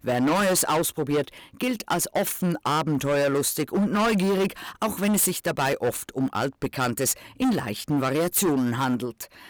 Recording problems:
distortion; heavy; 16% of the sound clipped

